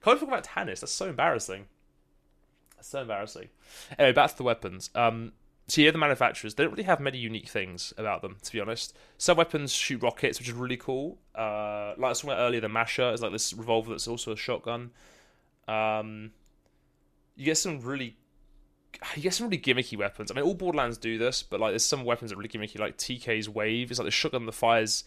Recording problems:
none

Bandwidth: 14.5 kHz